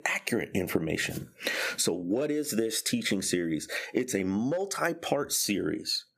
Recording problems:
squashed, flat; somewhat

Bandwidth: 15 kHz